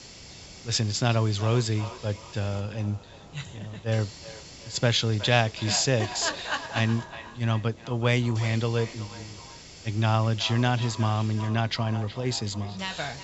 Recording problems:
echo of what is said; noticeable; throughout; 370 ms later, 15 dB below the speech
high frequencies cut off; noticeable; nothing above 7.5 kHz
hiss; noticeable; throughout; 20 dB below the speech

